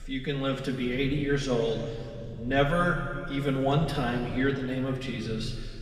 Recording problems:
room echo; noticeable; dies away in 2.1 s
off-mic speech; somewhat distant
low rumble; faint; throughout; 25 dB below the speech

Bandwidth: 14.5 kHz